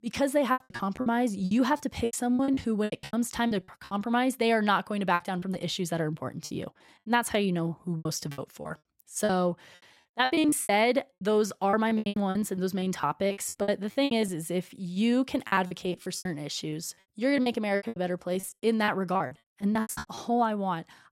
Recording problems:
choppy; very; 17% of the speech affected

